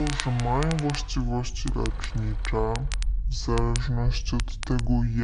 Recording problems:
wrong speed and pitch; too slow and too low; 0.6 times normal speed
traffic noise; noticeable; until 2.5 s; 15 dB below the speech
crackle, like an old record; noticeable; 10 dB below the speech
low rumble; faint; throughout; 25 dB below the speech
abrupt cut into speech; at the start and the end

